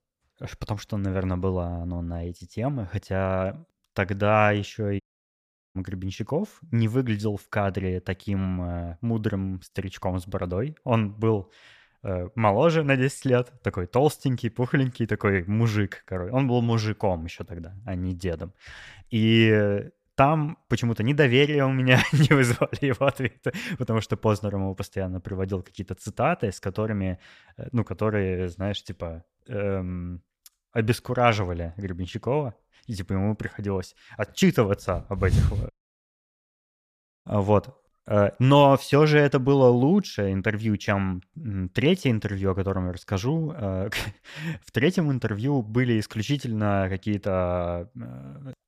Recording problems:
audio cutting out; at 5 s for 1 s and at 36 s for 1.5 s

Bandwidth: 14.5 kHz